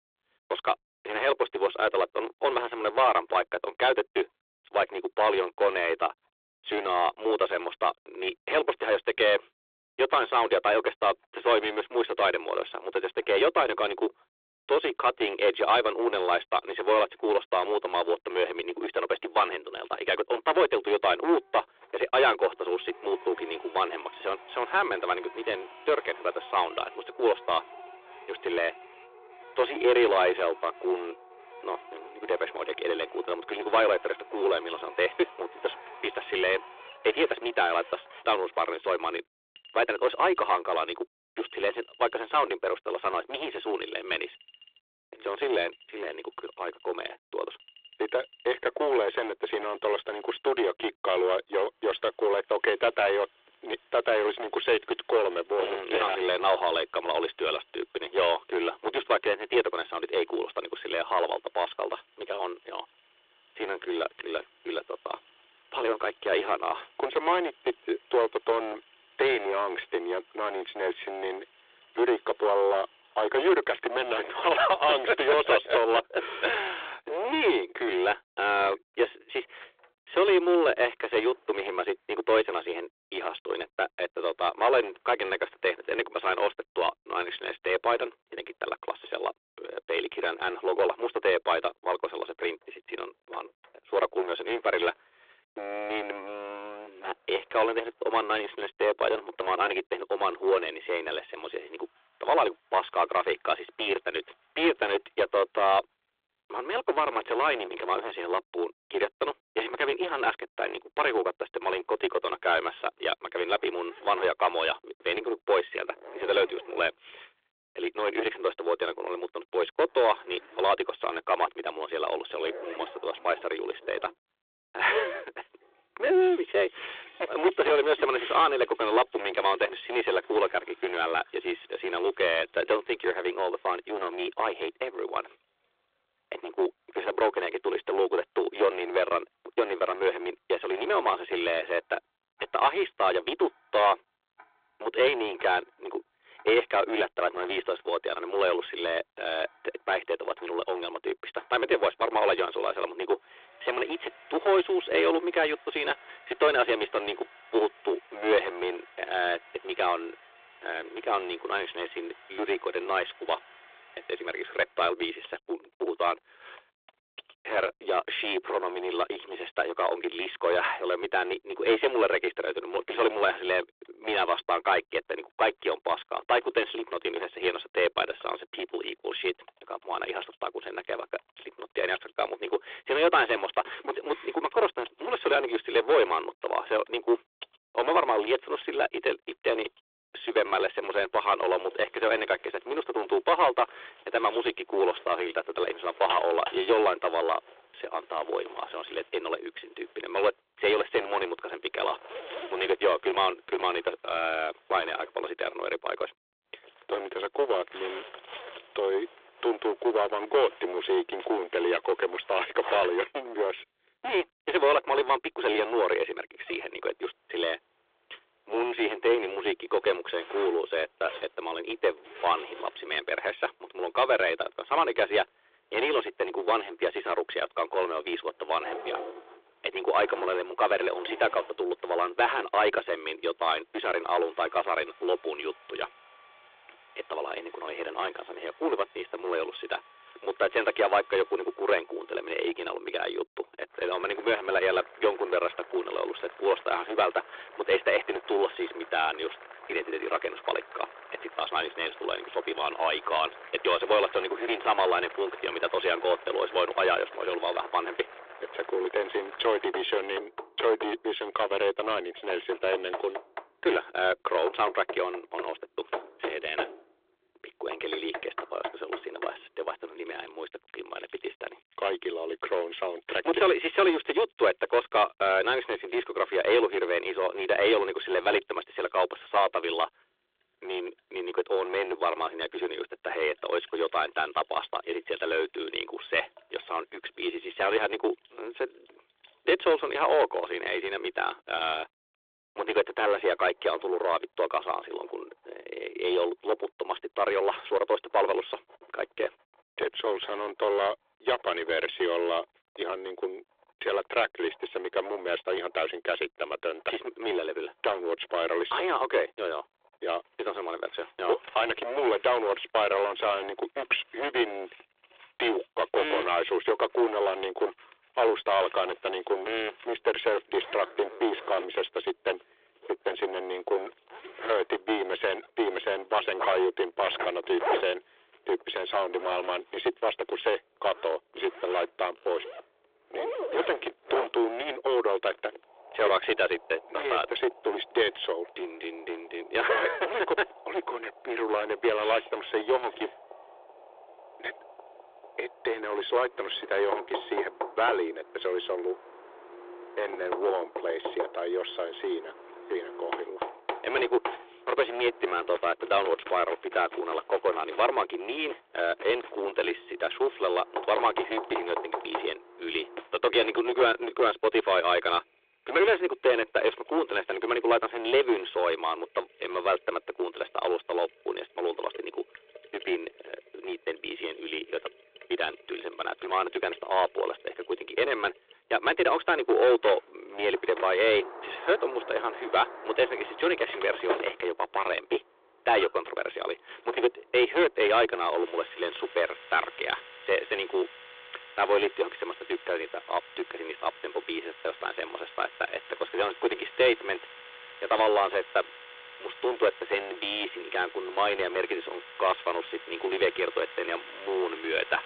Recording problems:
distortion; heavy; 6% of the sound clipped
phone-call audio
household noises; noticeable; throughout; 15 dB below the speech

